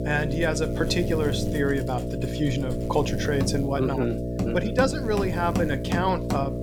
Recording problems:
electrical hum; loud; throughout; 60 Hz, 6 dB below the speech
machinery noise; loud; throughout; 8 dB below the speech

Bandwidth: 17.5 kHz